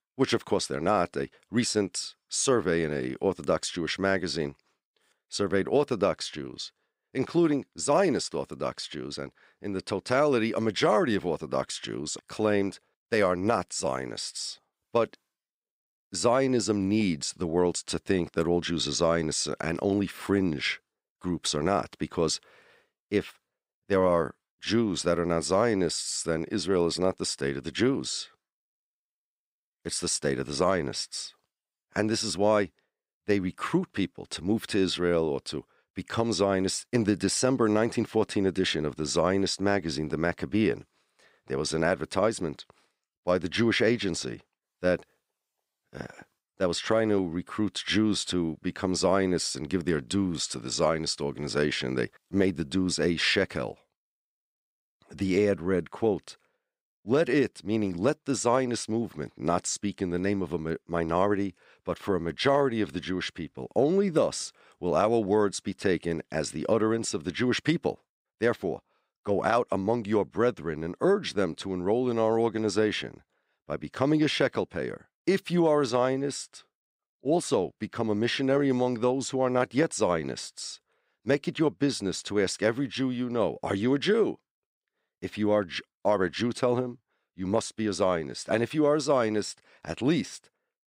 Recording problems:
none

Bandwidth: 15.5 kHz